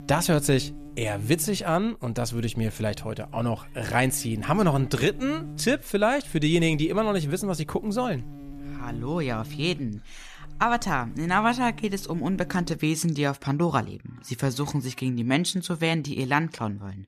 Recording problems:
electrical hum; very faint; until 13 s; 60 Hz, 20 dB below the speech

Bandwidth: 14.5 kHz